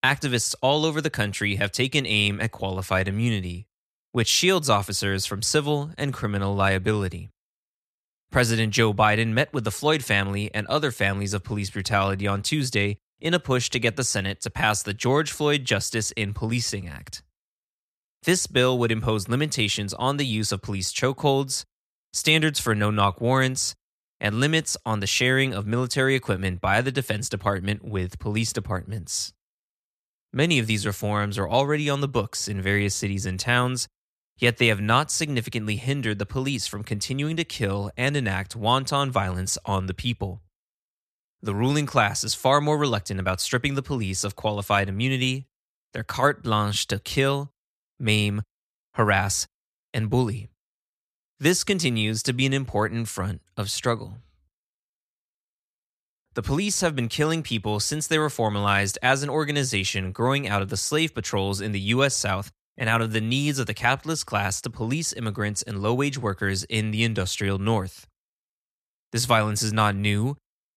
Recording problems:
none

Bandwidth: 14.5 kHz